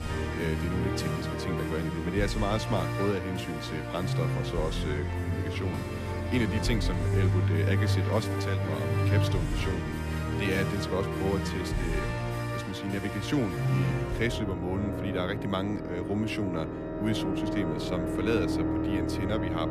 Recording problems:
background music; very loud; throughout; 2 dB above the speech

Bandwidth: 14.5 kHz